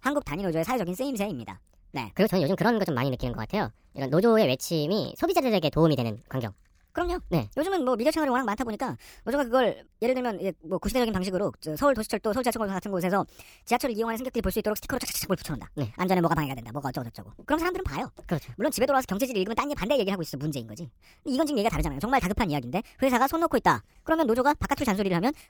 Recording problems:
wrong speed and pitch; too fast and too high; 1.5 times normal speed

